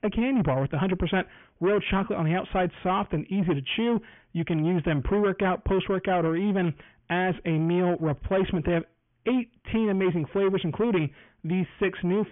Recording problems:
high frequencies cut off; severe; nothing above 3.5 kHz
distortion; slight; 10 dB below the speech

